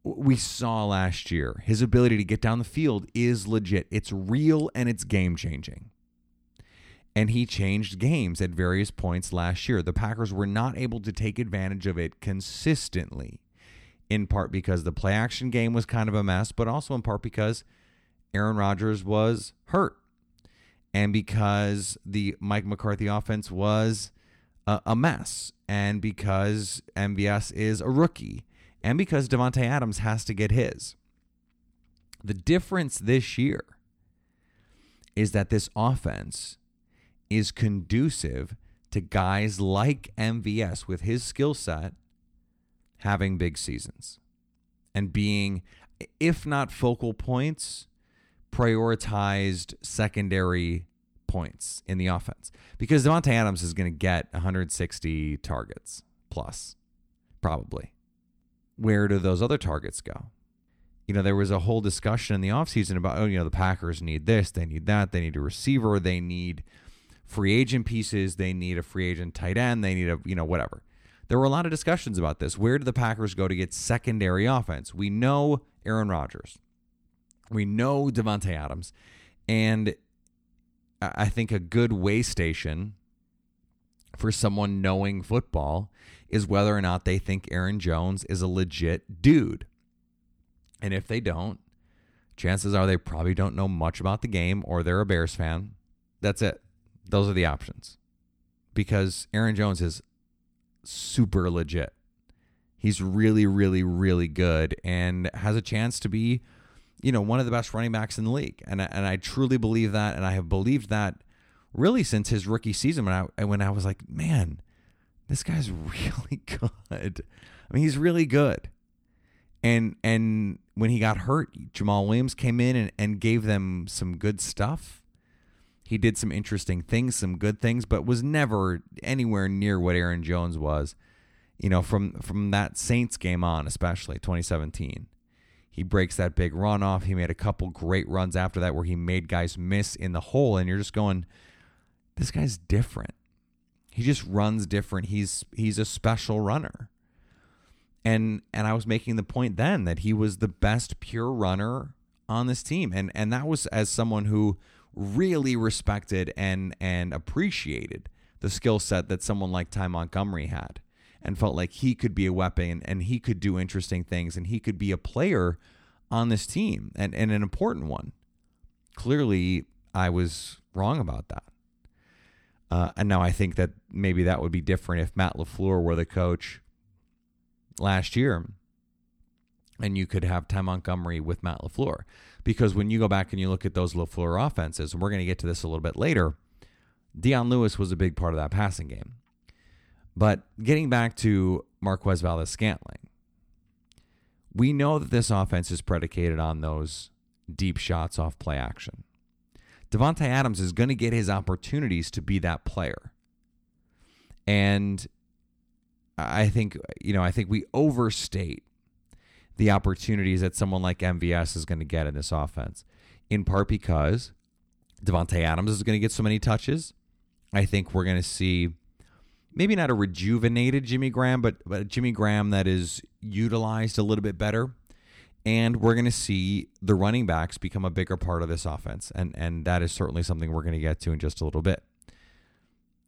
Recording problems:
none

